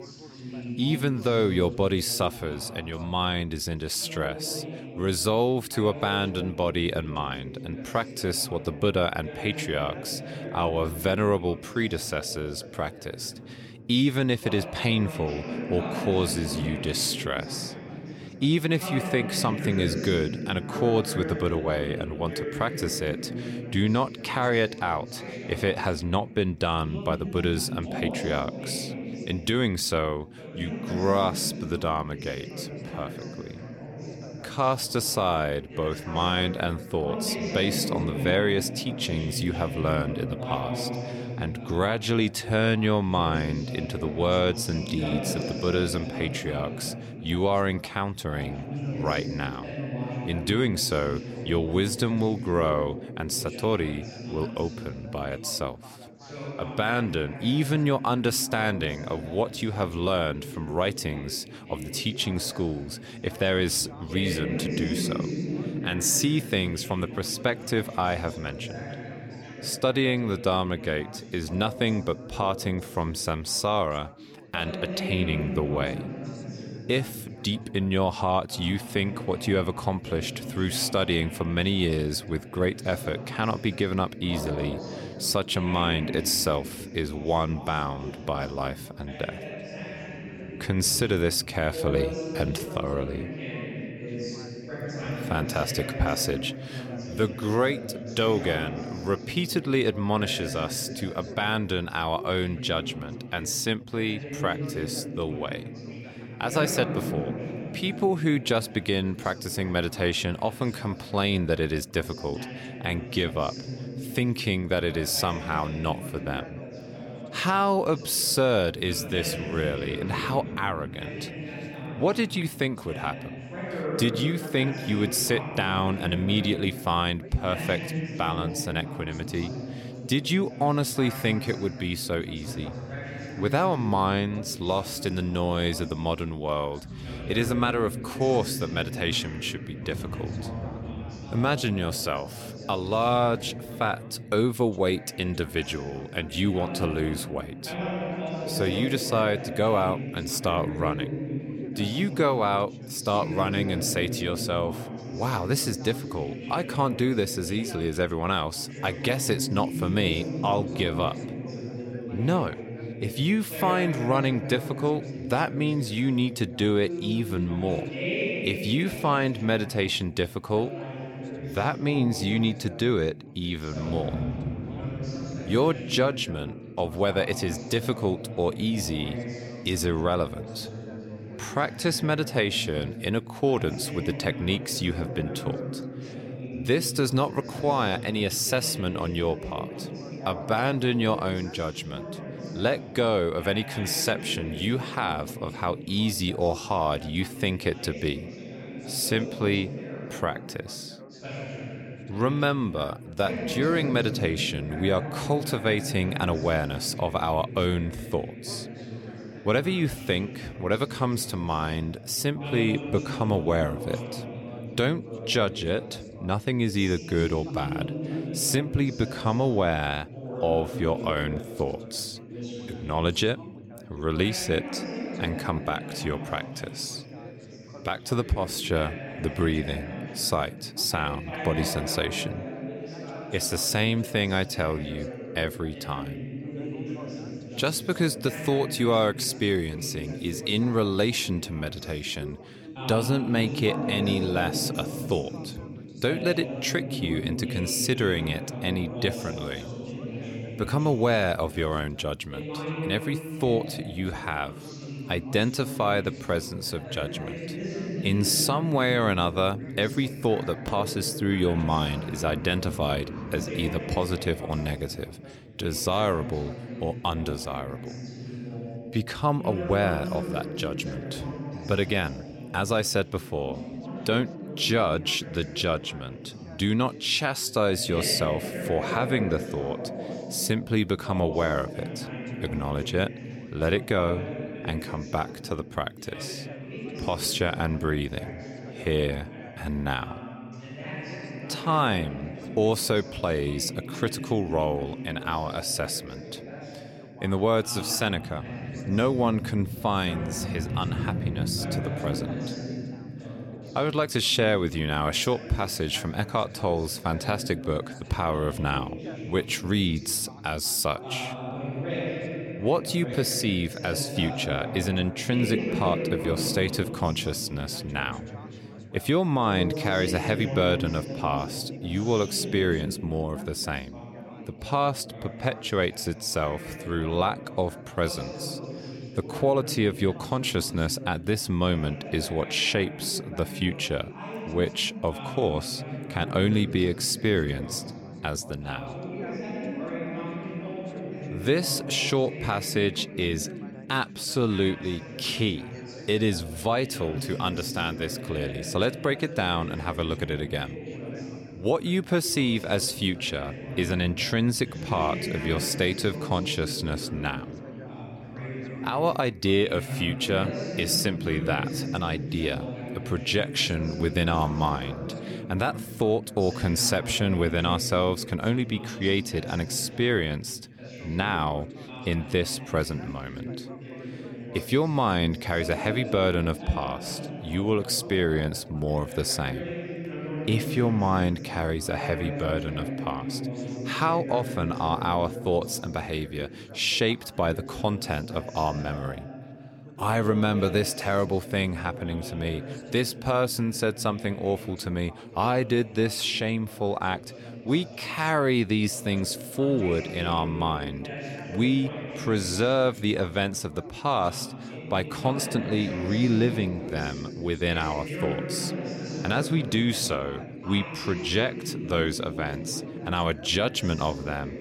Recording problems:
background chatter; loud; throughout; 3 voices, 9 dB below the speech

